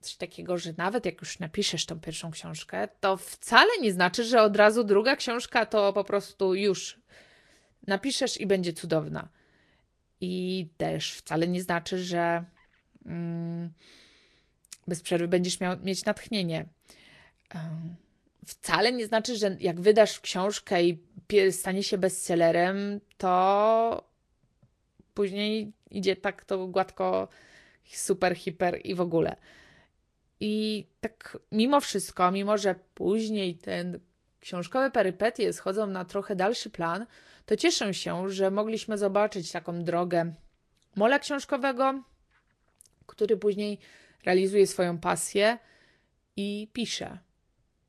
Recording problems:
garbled, watery; slightly; nothing above 12 kHz

